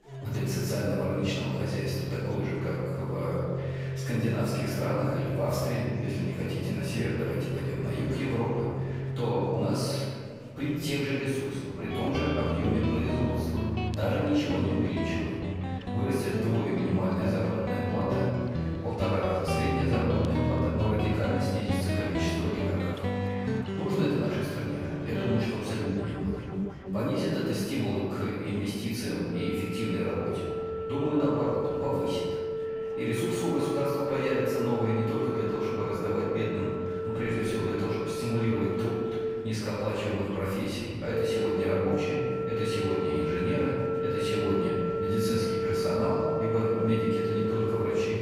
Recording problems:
room echo; strong; dies away in 1.9 s
off-mic speech; far
background music; loud; throughout; 2 dB below the speech
murmuring crowd; faint; throughout; 20 dB below the speech

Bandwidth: 15.5 kHz